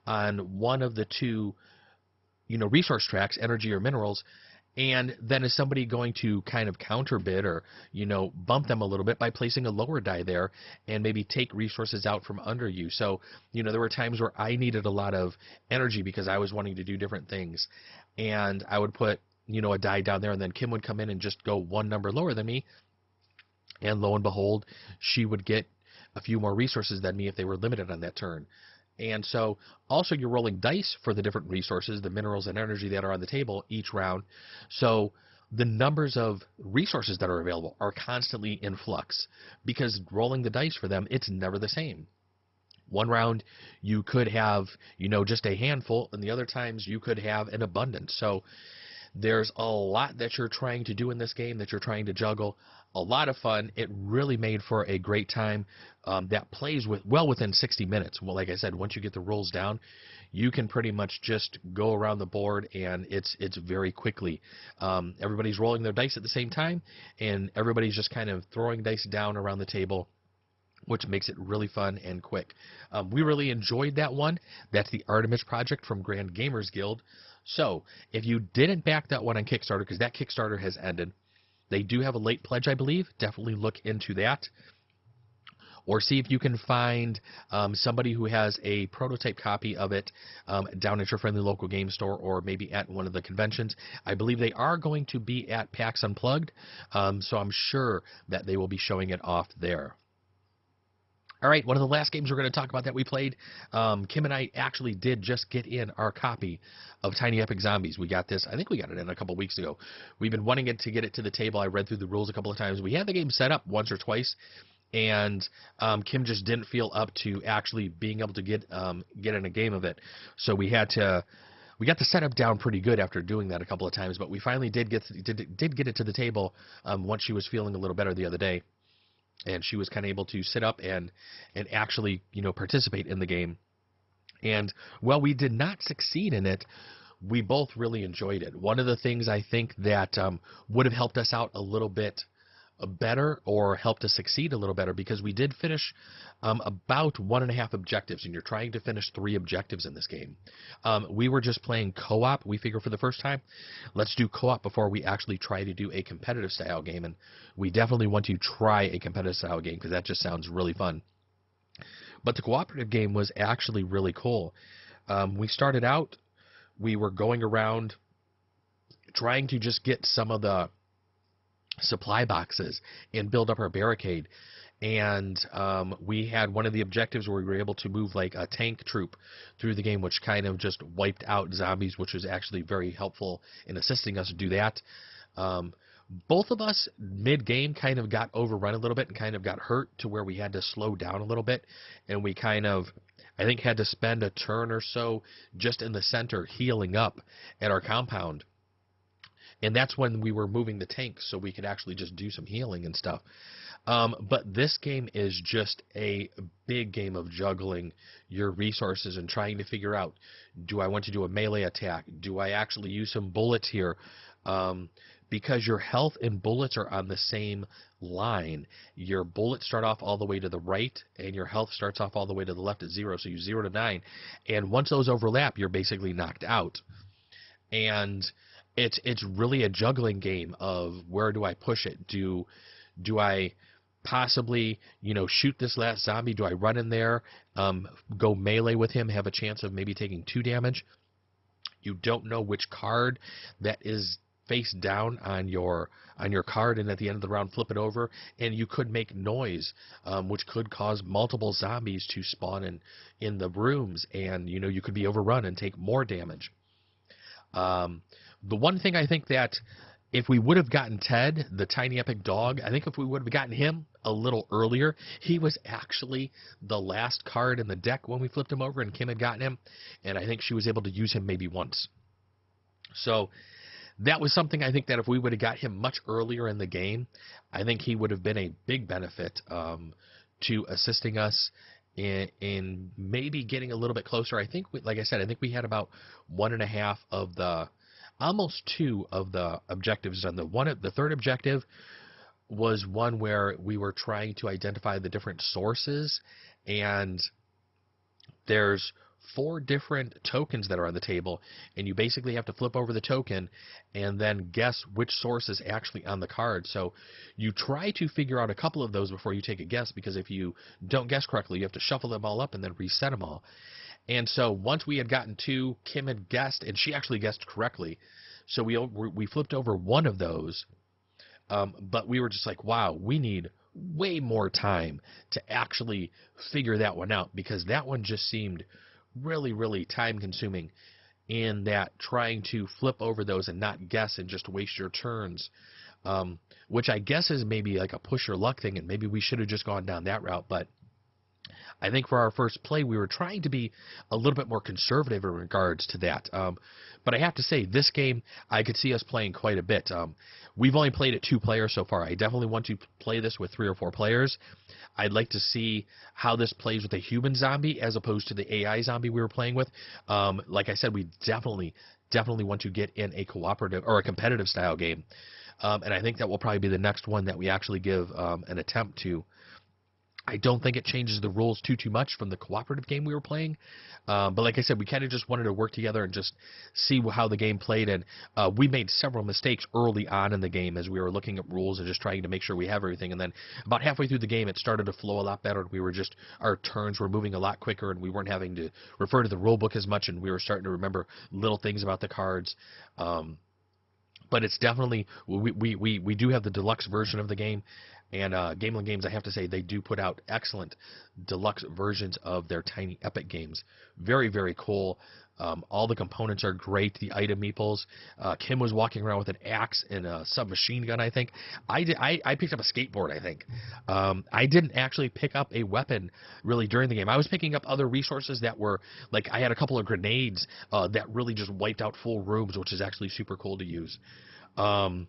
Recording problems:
garbled, watery; badly; nothing above 5.5 kHz

